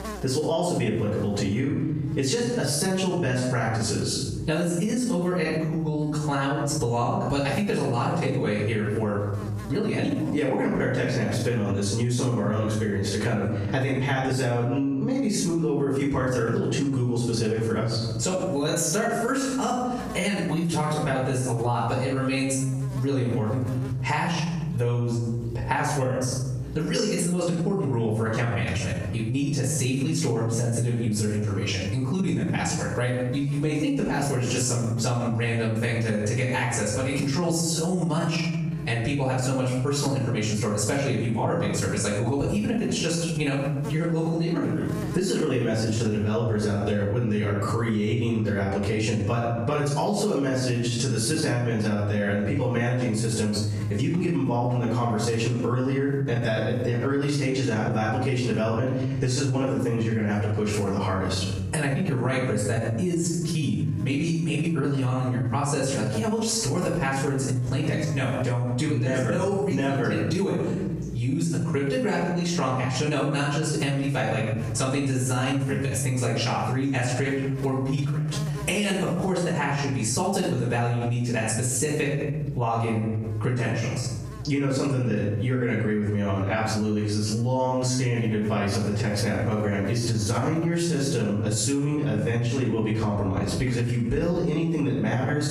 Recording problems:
off-mic speech; far
squashed, flat; heavily
room echo; noticeable; dies away in 0.7 s
electrical hum; faint; throughout; 60 Hz, 20 dB below the speech

